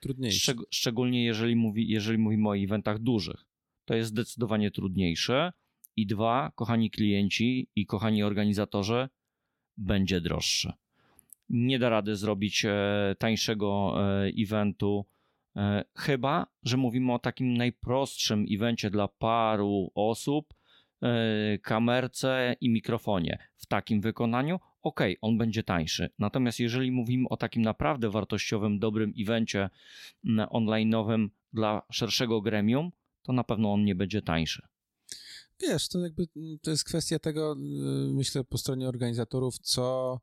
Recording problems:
none

